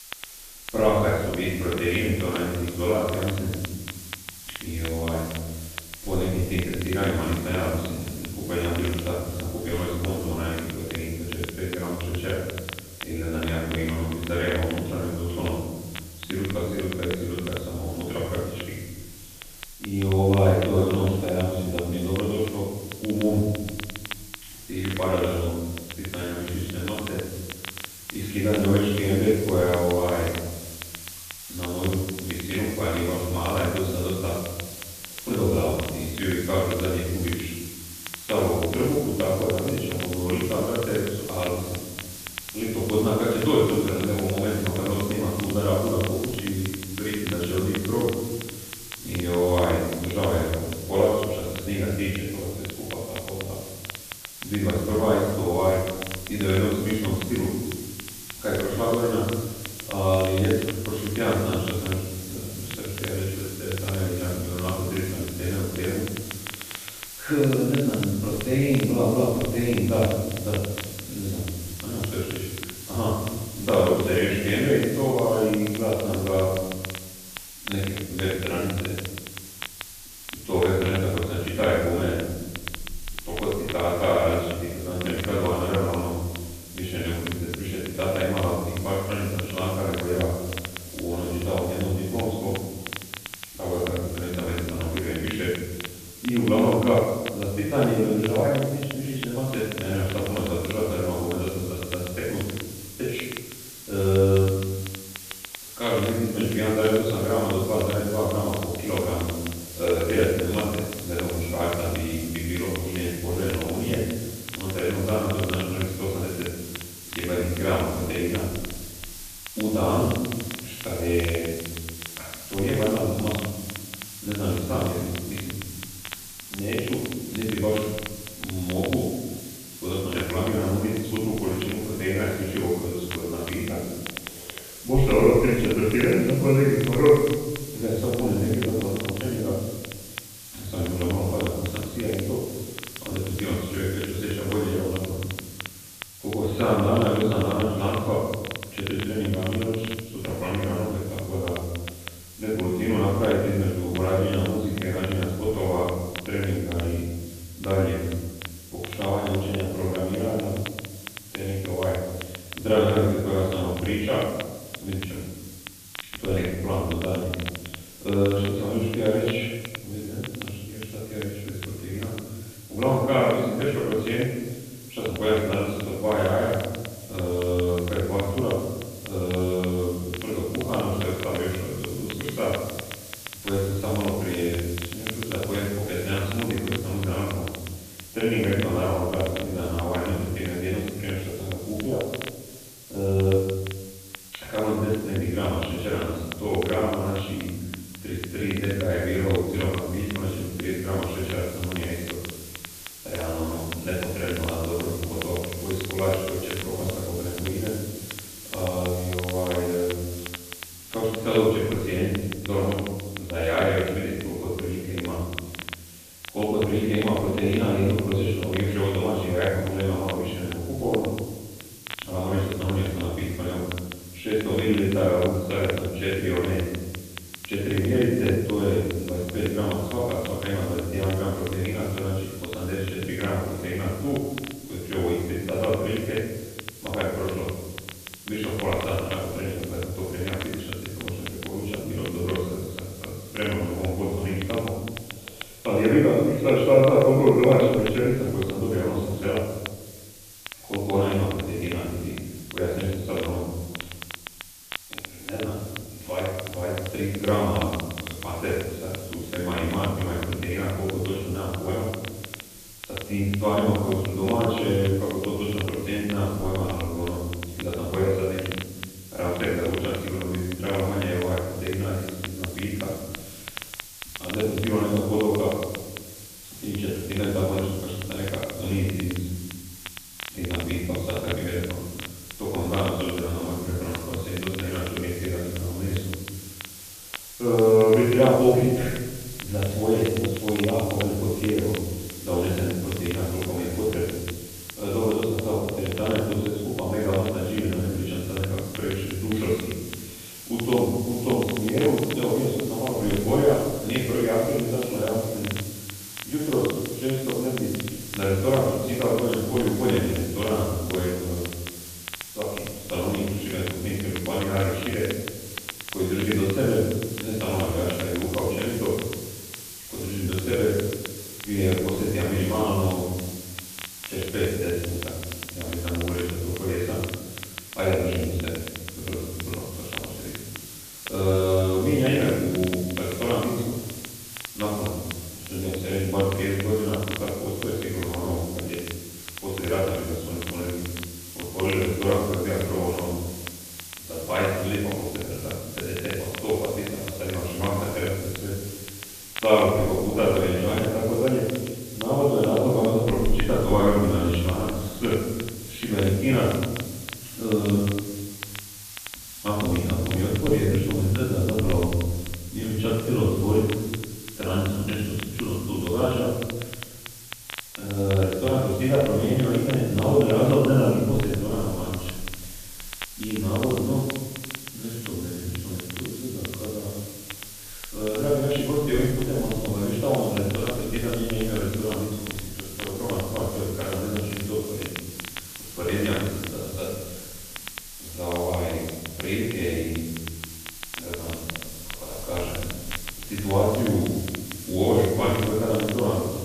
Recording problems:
room echo; strong; dies away in 1.3 s
off-mic speech; far
high frequencies cut off; severe; nothing above 4 kHz
hiss; noticeable; throughout; 15 dB below the speech
crackle, like an old record; noticeable; 15 dB below the speech

